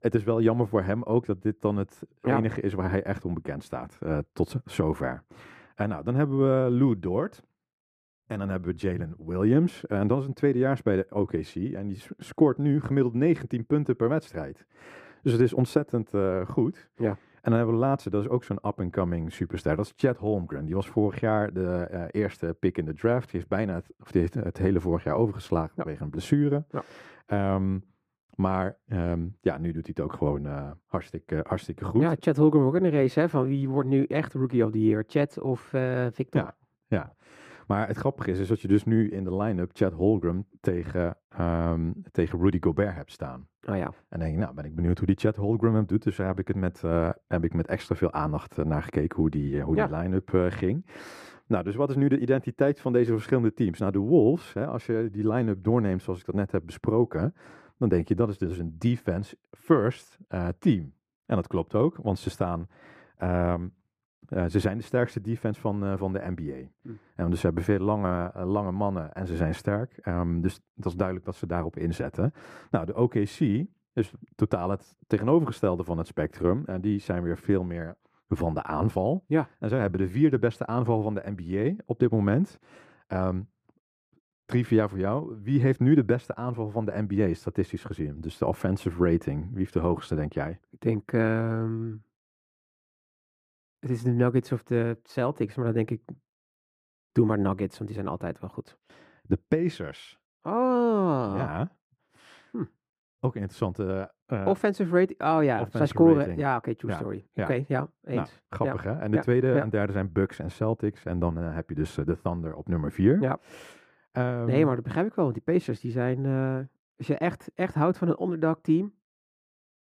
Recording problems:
muffled; slightly; fading above 2.5 kHz

